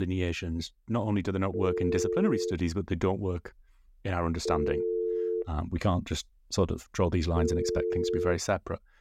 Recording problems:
abrupt cut into speech; at the start
phone ringing; loud; from 1.5 to 8.5 s; peak 1 dB above the speech

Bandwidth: 16 kHz